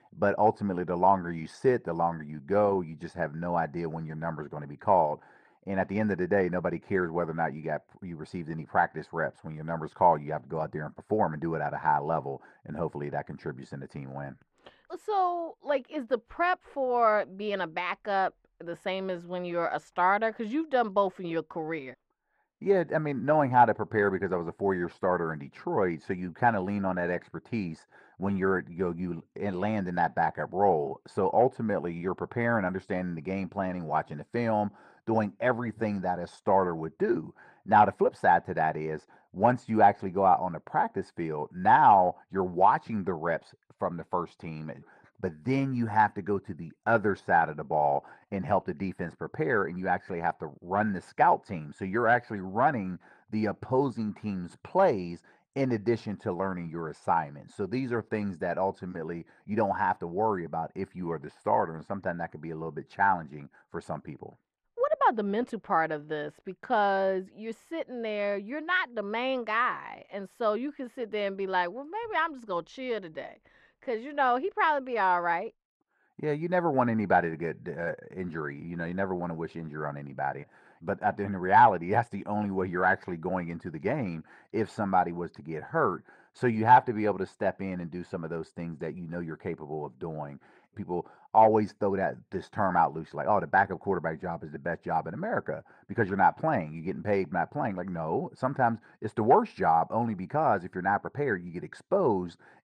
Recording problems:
muffled; very; fading above 4 kHz

